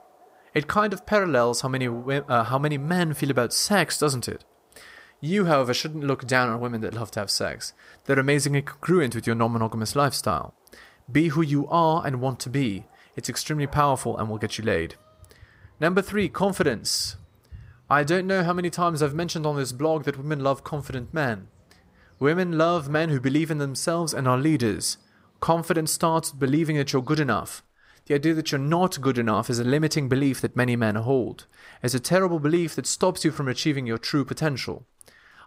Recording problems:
animal sounds; faint; throughout; 30 dB below the speech

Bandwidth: 15.5 kHz